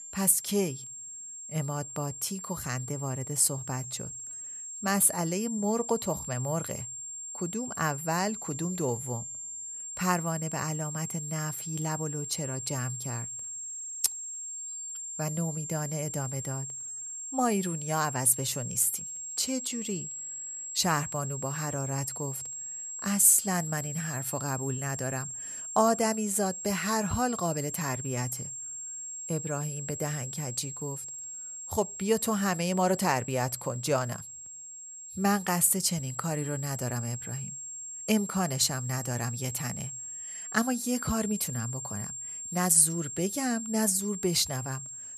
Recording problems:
high-pitched whine; loud; throughout; 7.5 kHz, 7 dB below the speech

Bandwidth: 13.5 kHz